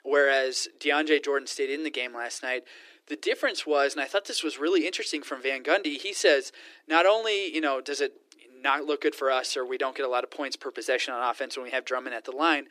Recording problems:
thin; very; fading below 300 Hz

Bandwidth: 14.5 kHz